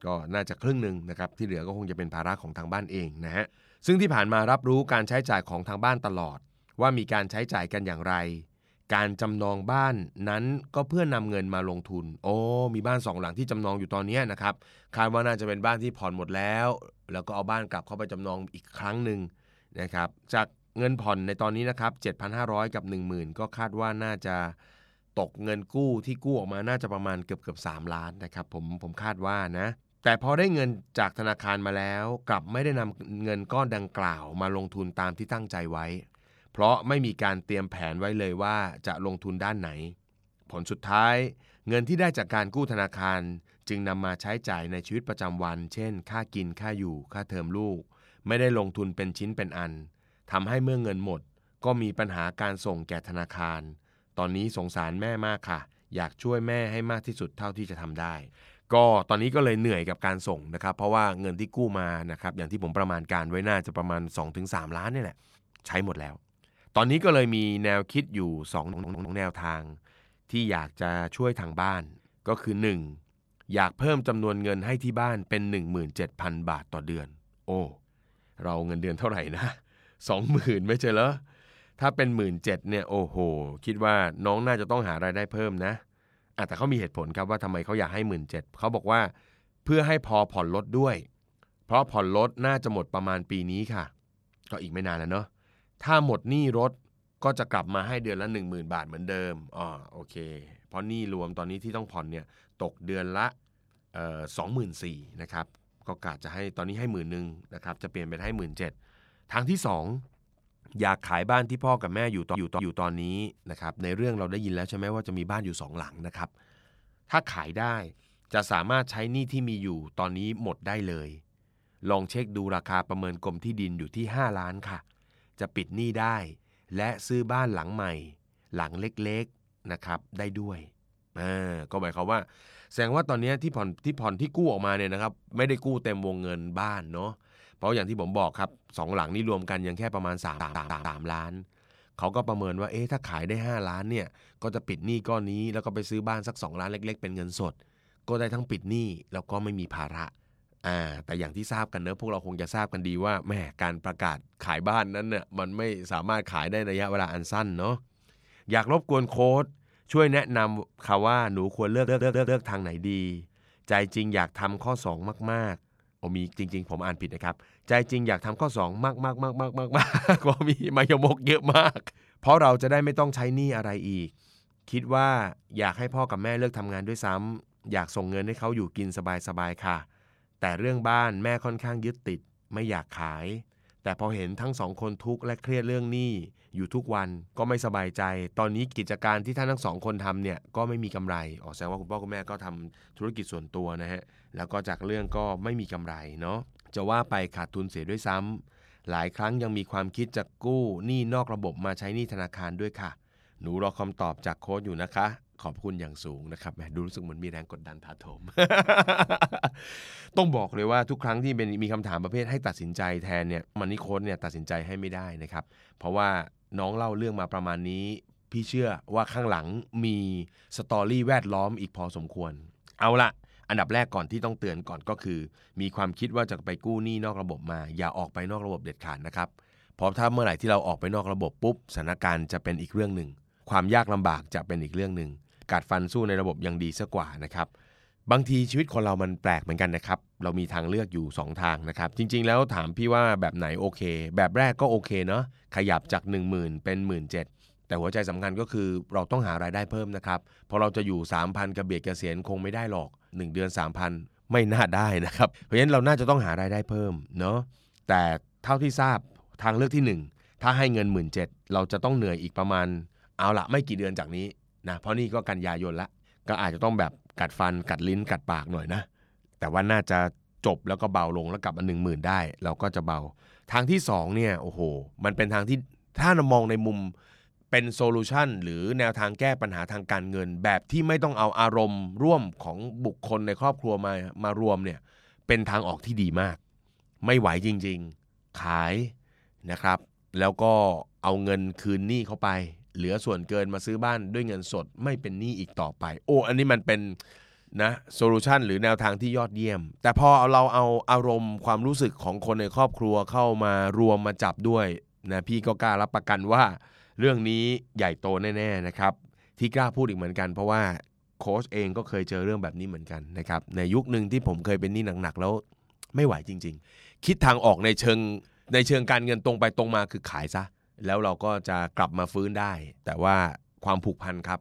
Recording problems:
audio stuttering; 4 times, first at 1:09

